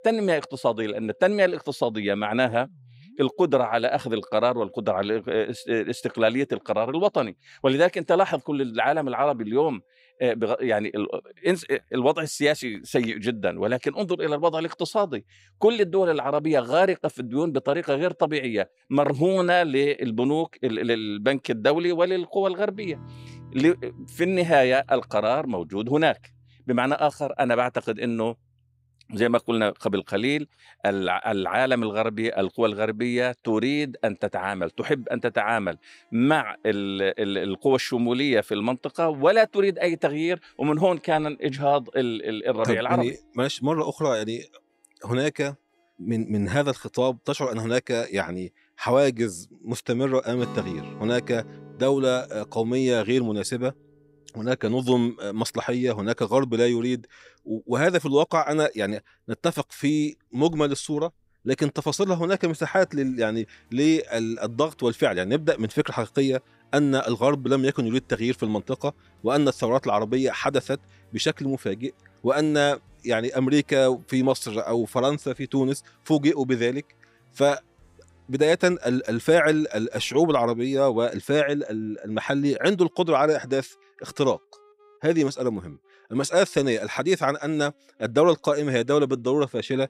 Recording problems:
background music; faint; throughout; 25 dB below the speech

